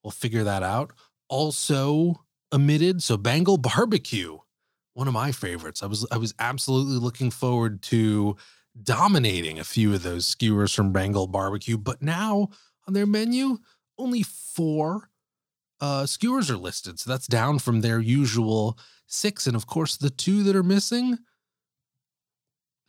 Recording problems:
none

